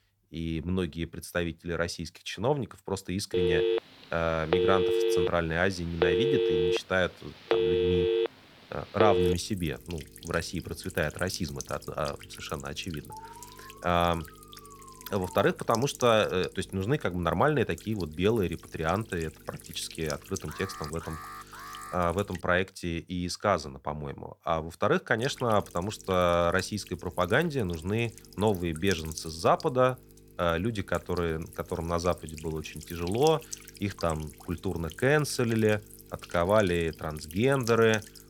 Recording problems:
electrical hum; noticeable; from 9 to 22 s and from 25 s on; 50 Hz, 15 dB below the speech
phone ringing; loud; from 3.5 to 9.5 s; peak 4 dB above the speech
alarm; faint; from 13 to 15 s and from 20 to 22 s; peak 15 dB below the speech

